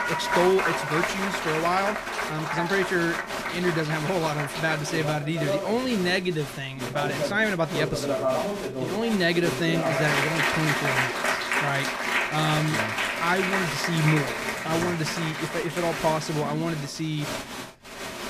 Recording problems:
crowd noise; loud; throughout; 1 dB below the speech

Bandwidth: 14.5 kHz